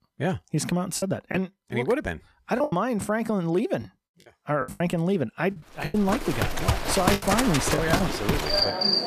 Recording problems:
animal sounds; very loud; from 6.5 s on; 2 dB above the speech
choppy; very; 9% of the speech affected

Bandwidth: 14.5 kHz